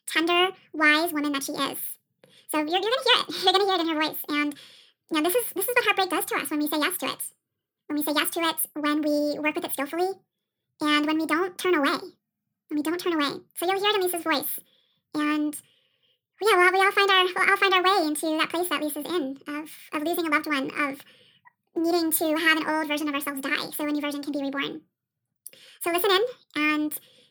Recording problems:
wrong speed and pitch; too fast and too high; 1.7 times normal speed

